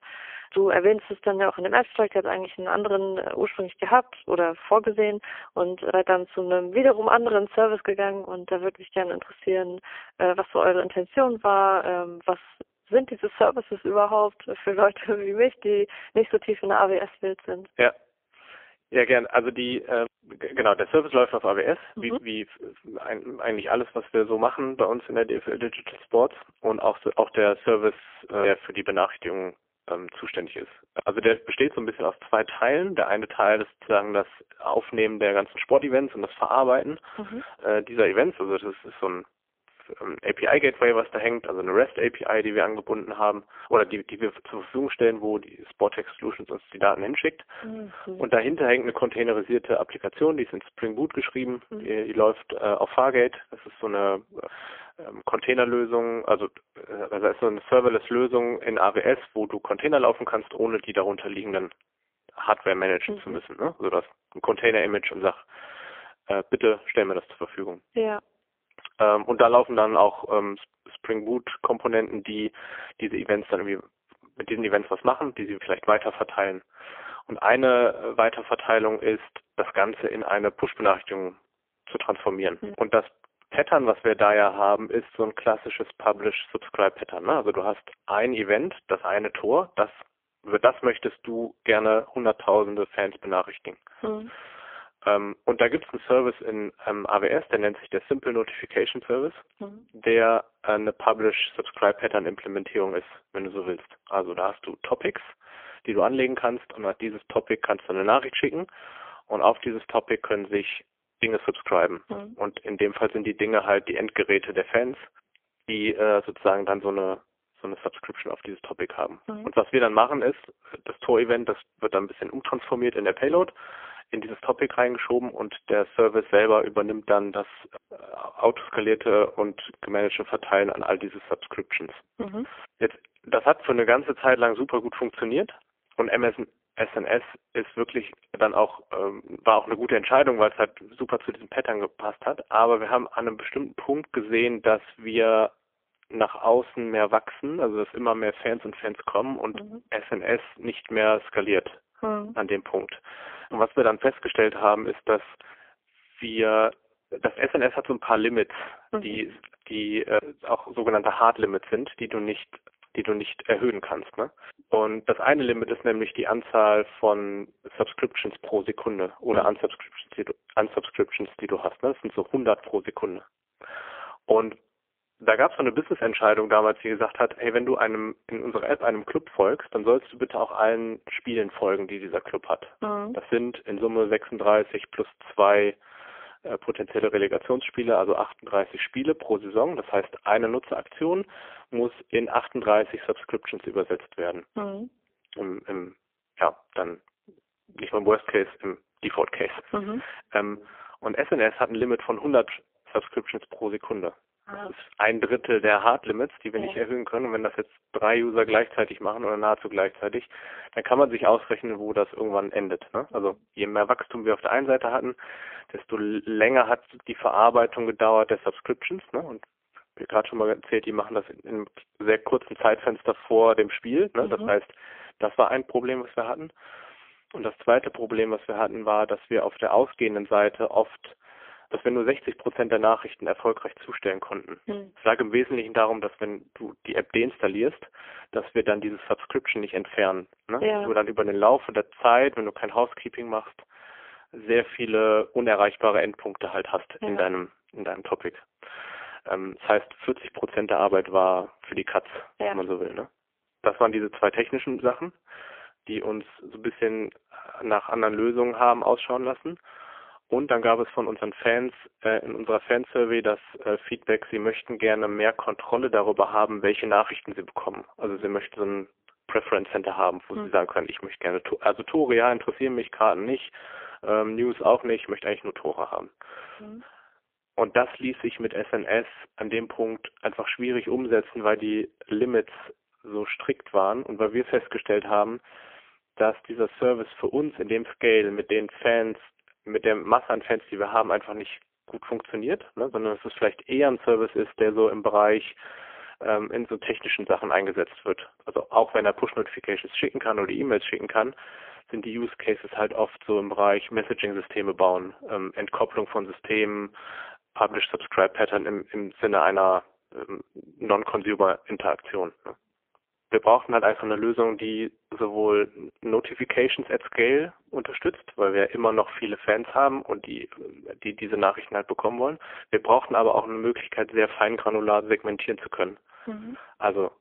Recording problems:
phone-call audio; poor line; nothing above 3.5 kHz

